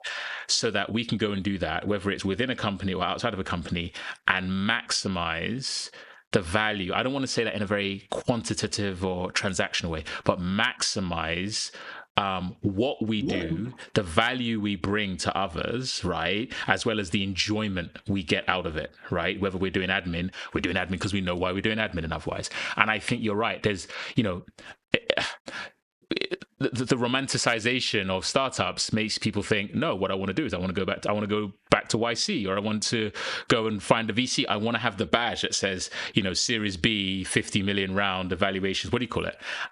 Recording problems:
squashed, flat; heavily

